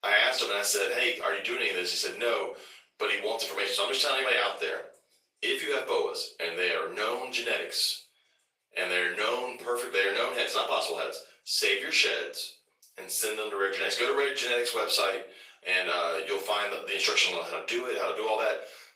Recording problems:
off-mic speech; far
thin; very; fading below 450 Hz
room echo; slight; dies away in 0.4 s
garbled, watery; slightly; nothing above 15.5 kHz

